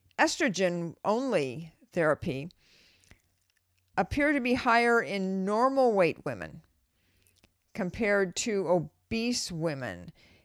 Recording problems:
none

